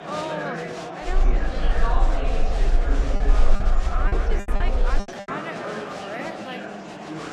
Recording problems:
wrong speed, natural pitch; too slow; 0.6 times normal speed
murmuring crowd; very loud; throughout; 5 dB above the speech
low rumble; noticeable; from 1 to 5 s; 15 dB below the speech
choppy; very; from 4 to 5.5 s; 24% of the speech affected

